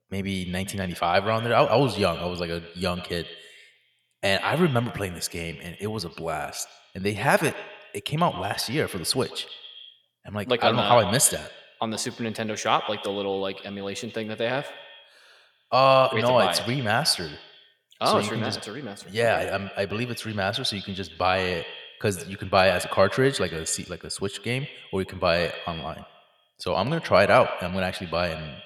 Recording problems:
echo of what is said; noticeable; throughout; 120 ms later, 15 dB below the speech

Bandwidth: 18 kHz